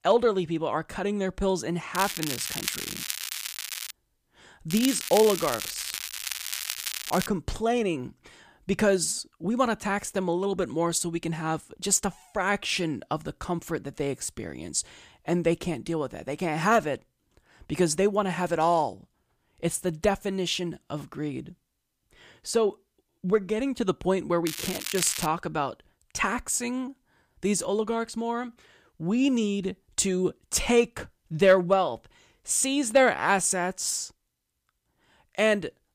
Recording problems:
crackling; loud; from 2 to 4 s, from 4.5 to 7.5 s and at 24 s; 5 dB below the speech

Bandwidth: 15 kHz